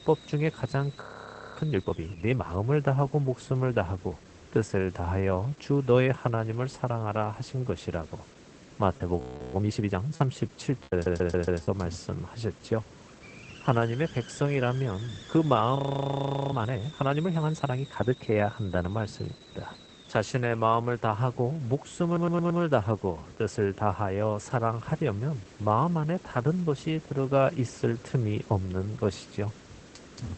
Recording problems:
garbled, watery; badly; nothing above 8 kHz
hiss; faint; throughout; 20 dB below the speech
audio freezing; at 1 s for 0.5 s, at 9 s and at 16 s for 1 s
choppy; very; from 9 to 12 s; 7% of the speech affected
audio stuttering; at 11 s and at 22 s

